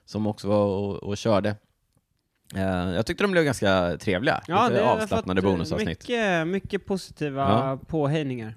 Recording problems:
none

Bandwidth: 14.5 kHz